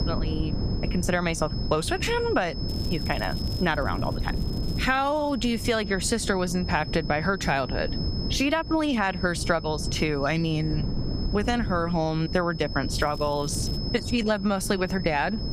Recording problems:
squashed, flat; somewhat
high-pitched whine; noticeable; throughout; 5 kHz, 15 dB below the speech
wind noise on the microphone; occasional gusts; 15 dB below the speech
crackling; faint; from 2.5 to 5.5 s and at 13 s; 25 dB below the speech

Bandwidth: 15.5 kHz